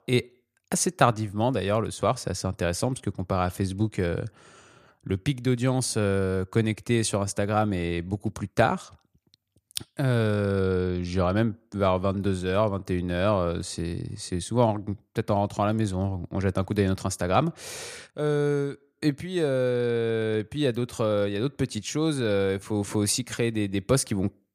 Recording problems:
none

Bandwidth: 15 kHz